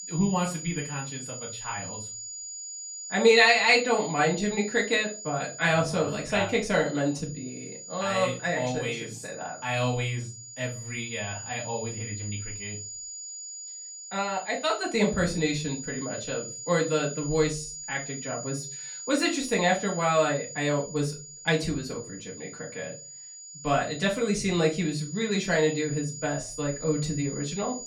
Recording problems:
off-mic speech; far
room echo; very slight; dies away in 0.3 s
high-pitched whine; noticeable; throughout; 7 kHz, 10 dB below the speech

